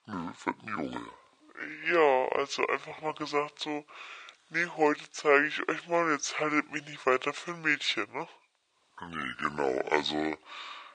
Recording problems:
thin; very; fading below 650 Hz
wrong speed and pitch; too slow and too low; 0.7 times normal speed

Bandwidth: 9.5 kHz